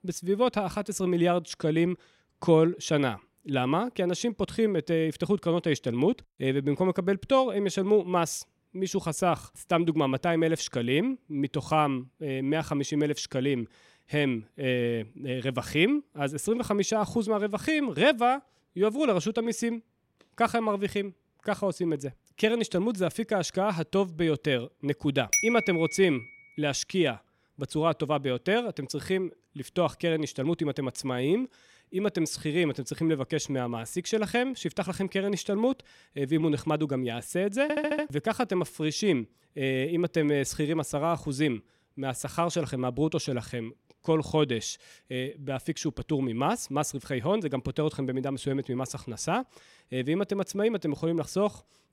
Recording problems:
audio stuttering; at 38 s

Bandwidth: 16 kHz